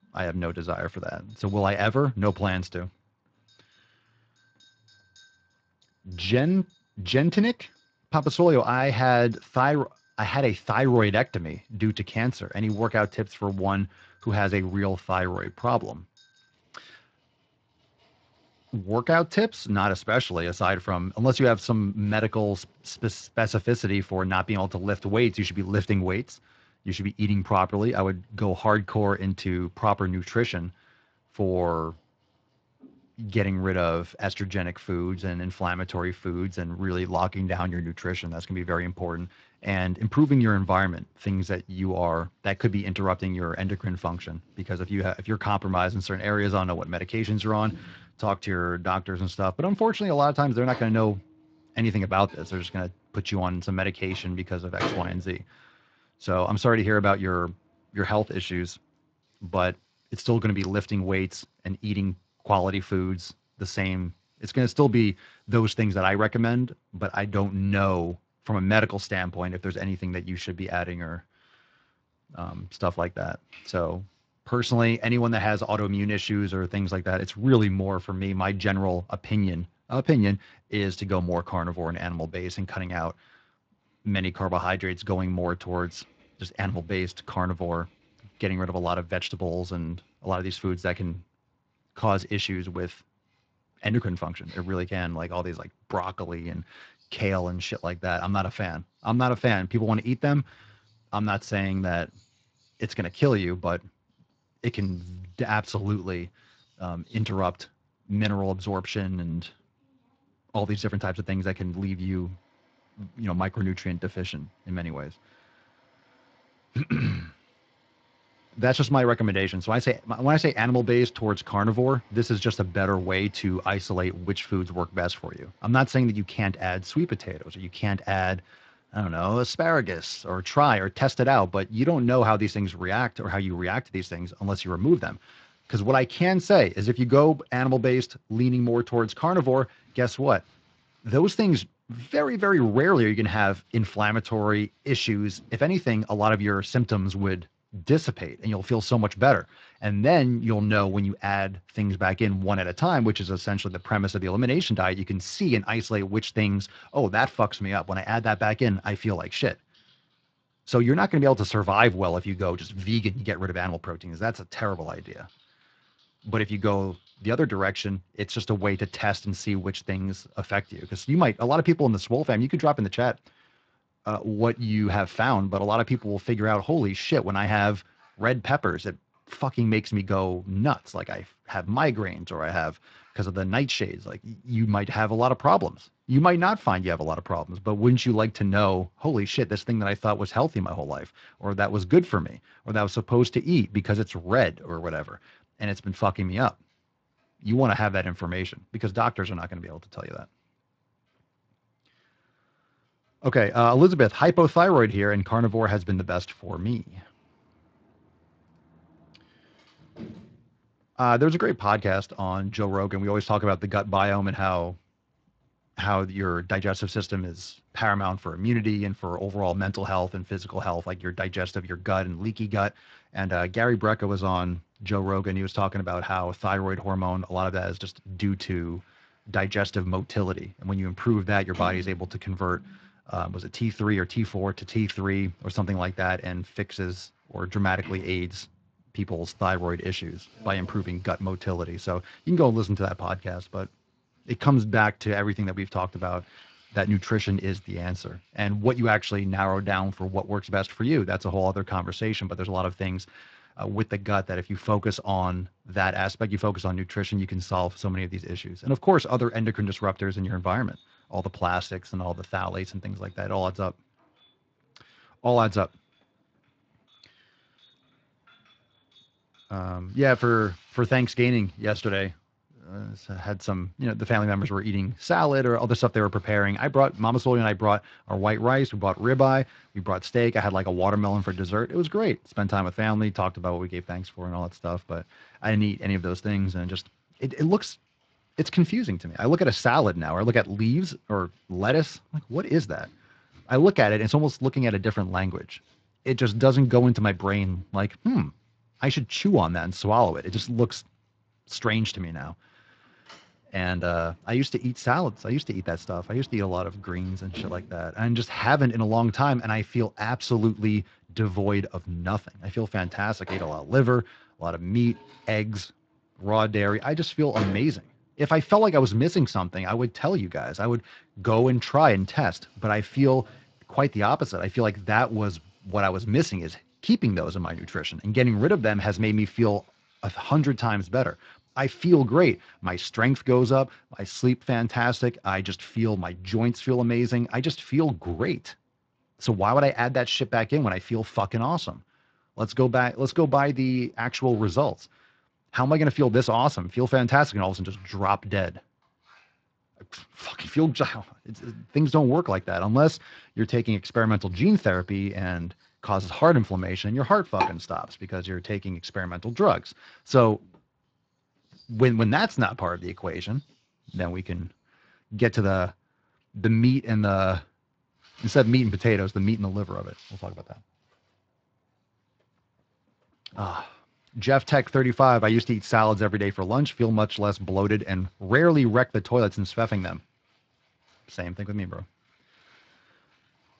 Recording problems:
garbled, watery; slightly
household noises; faint; throughout; 25 dB below the speech

